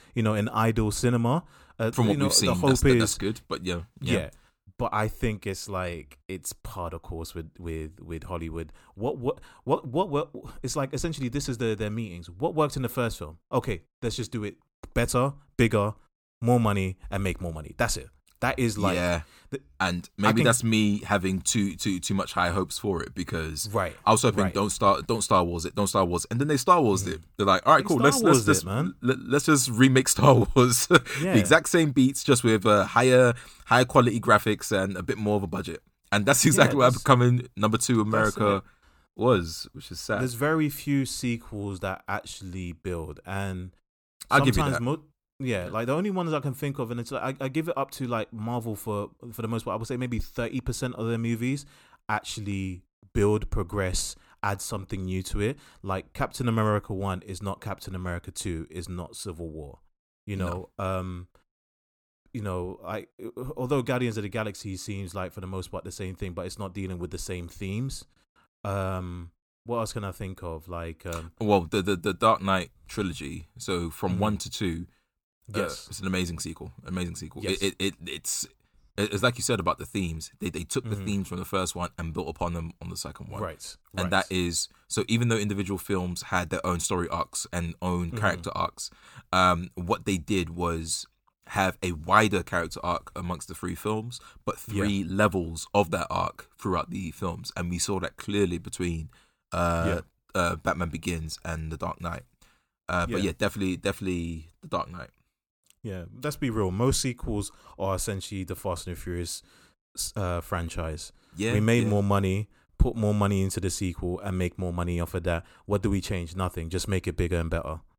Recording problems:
none

